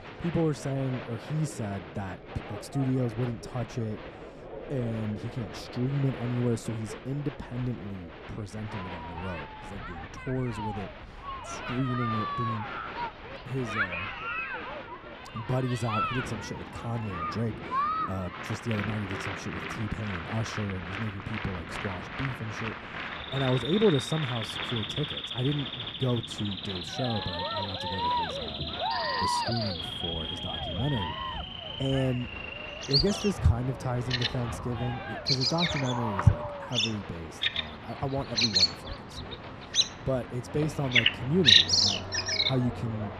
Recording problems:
animal sounds; very loud; throughout; 5 dB above the speech
crowd noise; loud; throughout; 4 dB below the speech
rain or running water; noticeable; throughout; 15 dB below the speech

